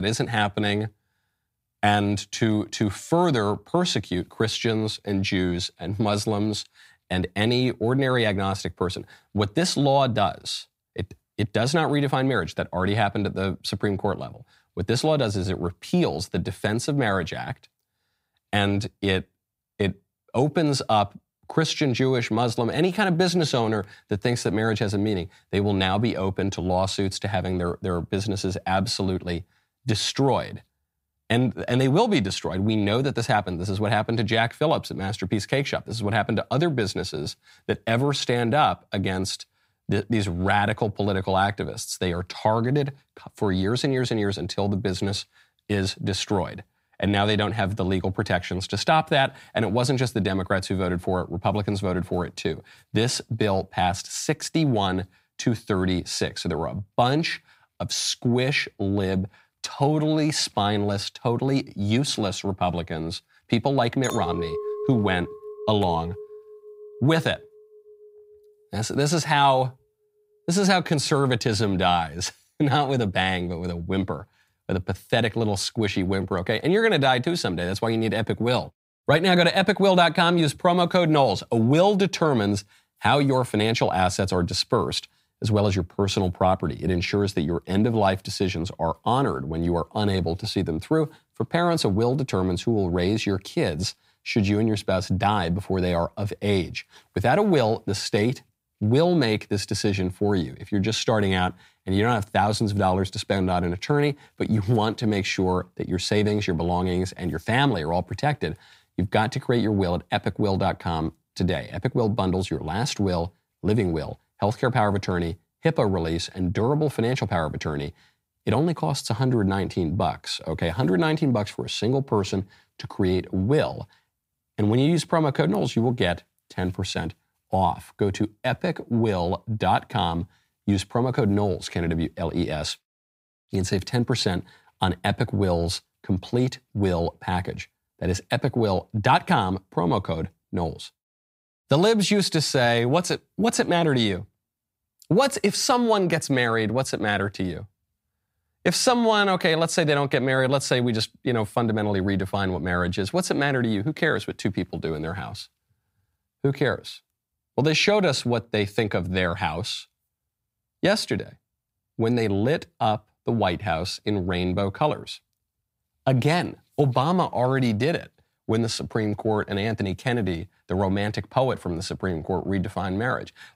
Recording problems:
abrupt cut into speech; at the start
clattering dishes; noticeable; from 1:04 to 1:07; peak 6 dB below the speech

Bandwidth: 15.5 kHz